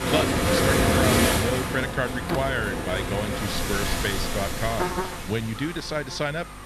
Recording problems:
rain or running water; very loud; throughout; 4 dB above the speech
electrical hum; loud; throughout; 50 Hz, 8 dB below the speech

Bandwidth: 13.5 kHz